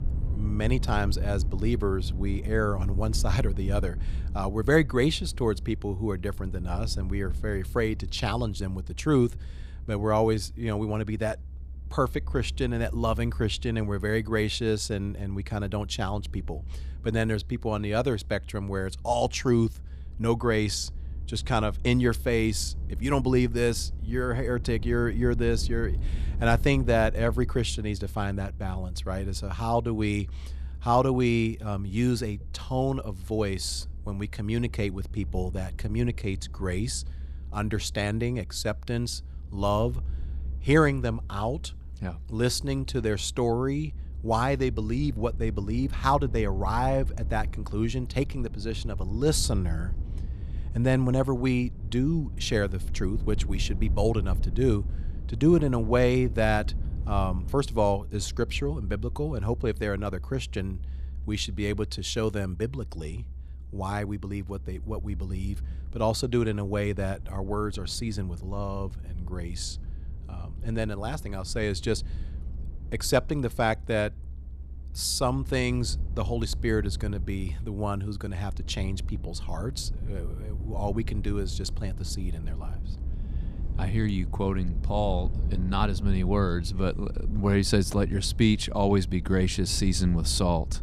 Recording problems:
low rumble; faint; throughout; 20 dB below the speech

